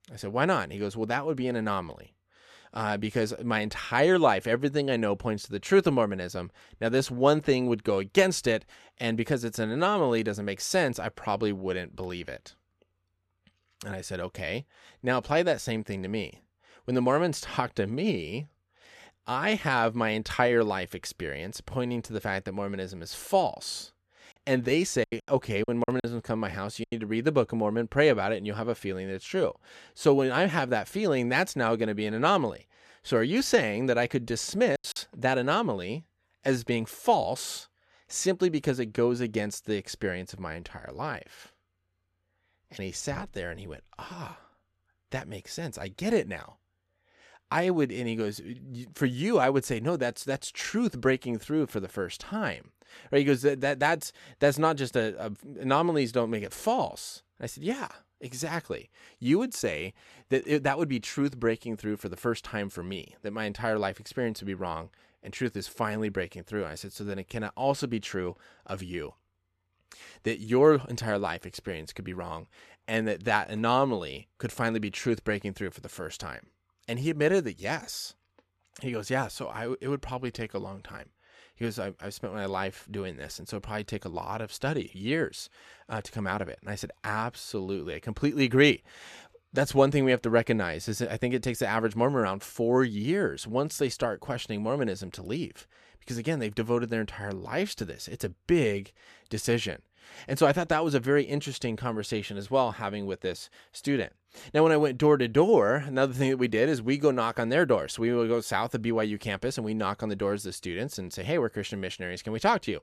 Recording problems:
choppy; very; from 24 to 27 s and at 35 s; 11% of the speech affected

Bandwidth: 13.5 kHz